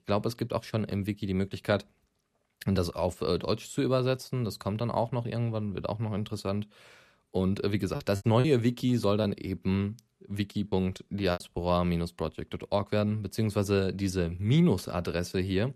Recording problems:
choppy; very; from 8 to 9 s and at 11 s; 8% of the speech affected

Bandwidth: 14 kHz